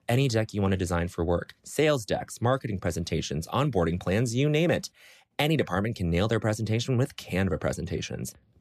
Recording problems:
none

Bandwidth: 14.5 kHz